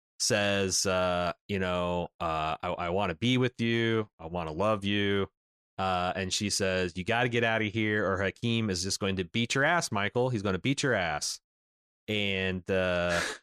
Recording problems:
none

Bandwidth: 14 kHz